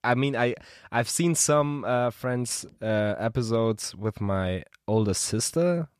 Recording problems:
none

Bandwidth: 14.5 kHz